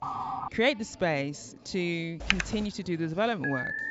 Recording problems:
high frequencies cut off; noticeable; nothing above 8 kHz
background chatter; faint; throughout; 3 voices, 25 dB below the speech
siren; noticeable; at the start; peak 3 dB below the speech
keyboard typing; loud; at 2.5 s; peak 2 dB above the speech
alarm; noticeable; at 3.5 s; peak 2 dB below the speech

